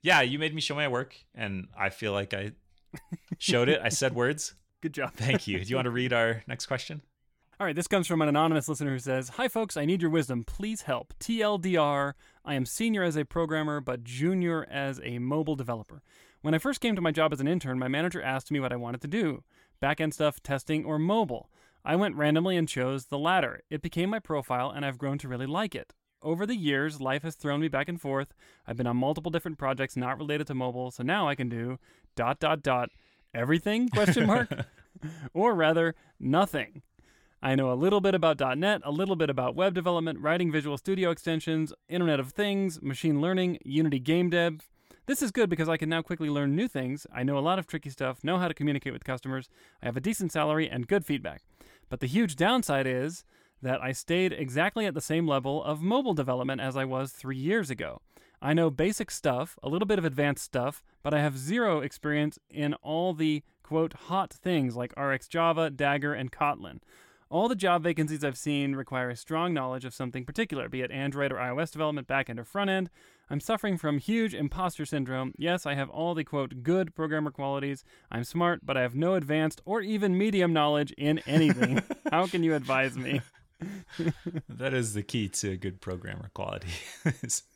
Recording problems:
none

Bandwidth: 17 kHz